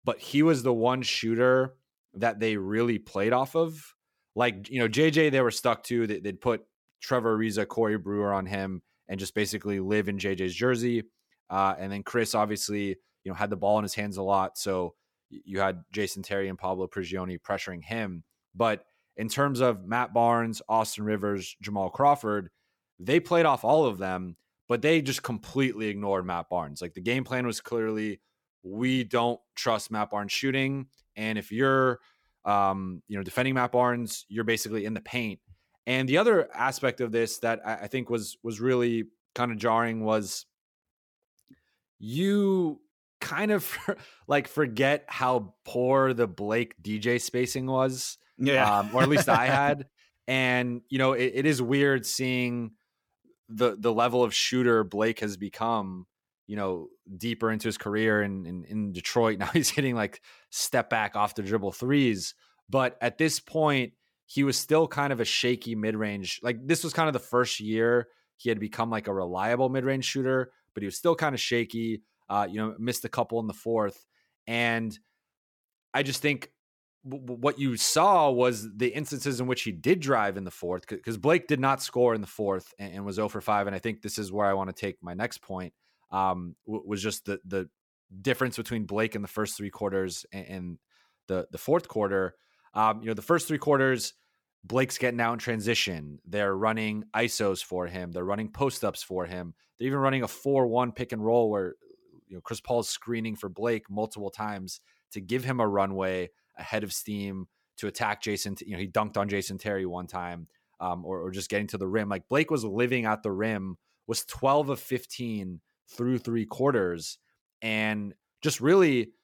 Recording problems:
none

